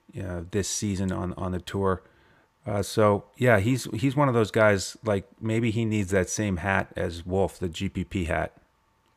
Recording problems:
none

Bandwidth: 15 kHz